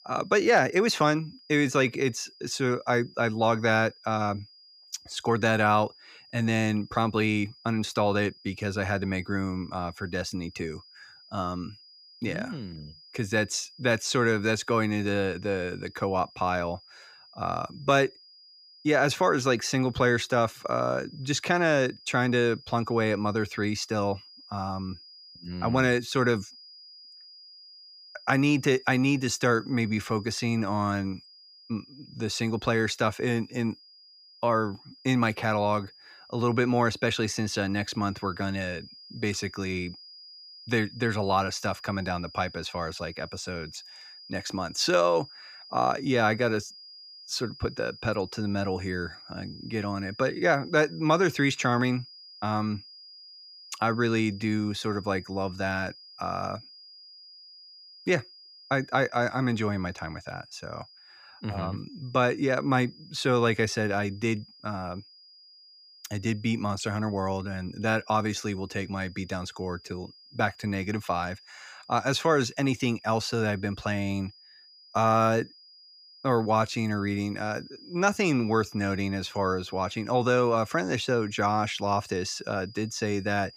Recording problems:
high-pitched whine; faint; throughout; 5 kHz, 20 dB below the speech

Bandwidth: 15 kHz